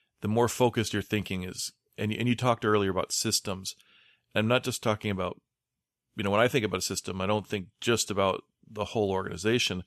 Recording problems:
none

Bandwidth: 13.5 kHz